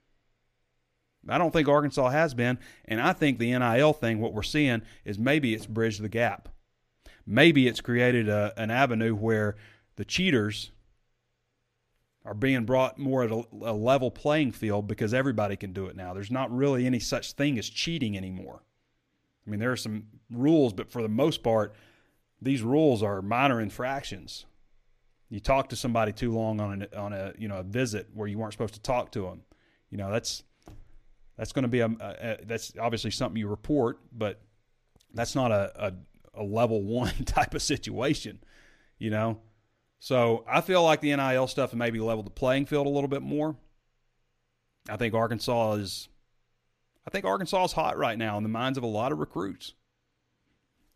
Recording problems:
none

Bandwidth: 14.5 kHz